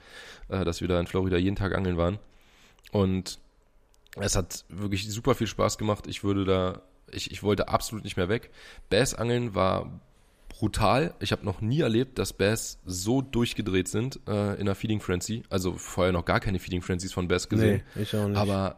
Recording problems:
none

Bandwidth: 15 kHz